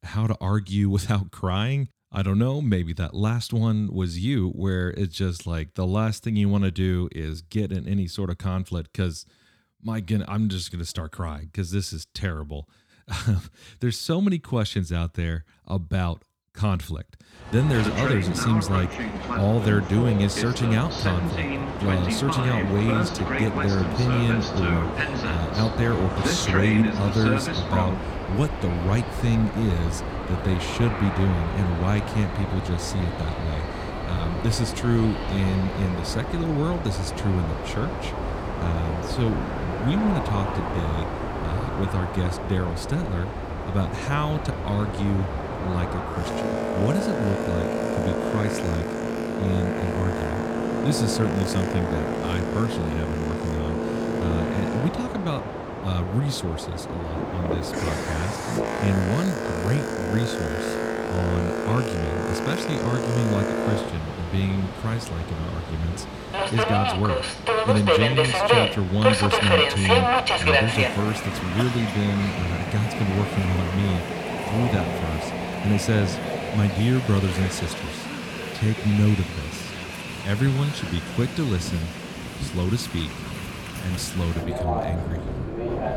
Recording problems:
train or aircraft noise; loud; from 18 s on; 1 dB below the speech

